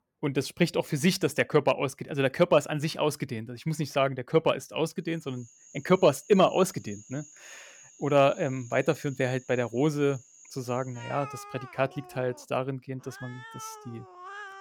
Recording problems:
animal sounds; noticeable; from 5.5 s on; 20 dB below the speech

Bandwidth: 18 kHz